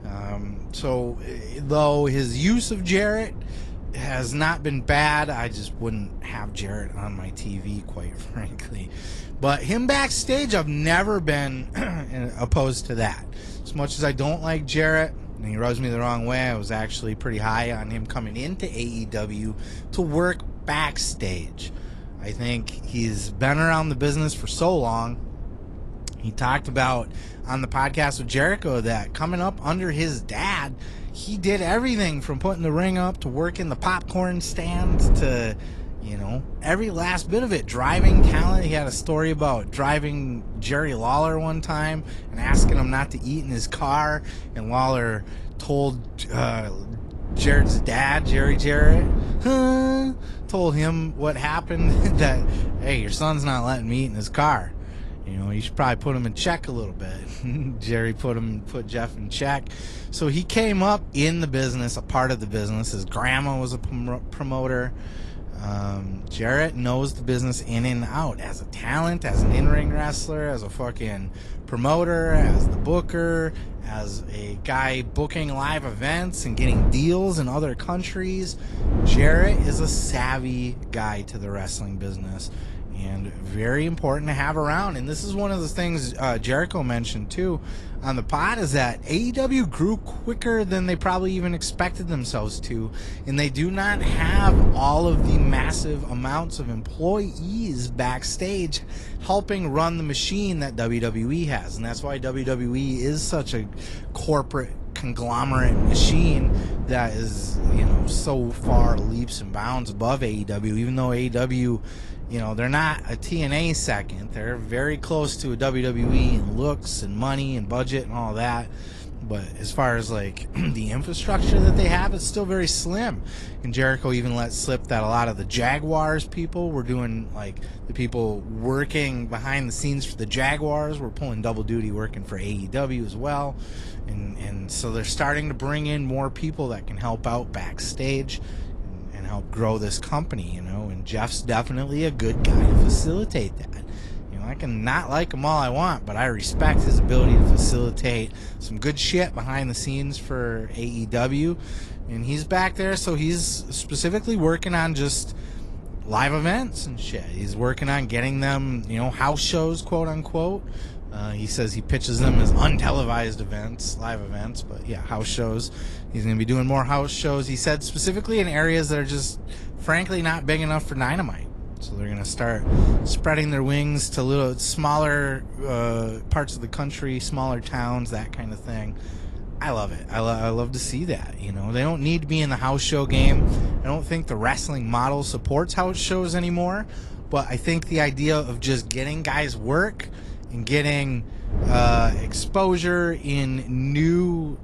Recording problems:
garbled, watery; slightly
wind noise on the microphone; occasional gusts; 15 dB below the speech

